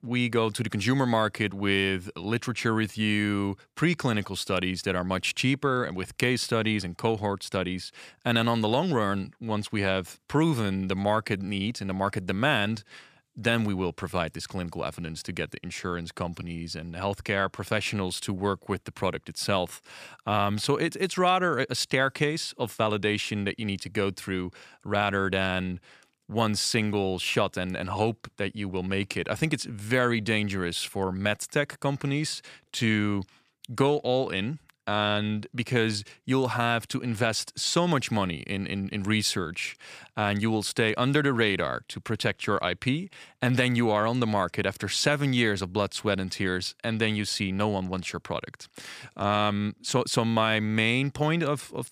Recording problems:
none

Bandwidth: 14.5 kHz